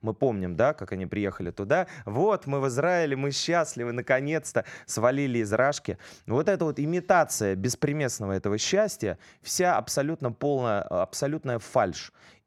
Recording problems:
none

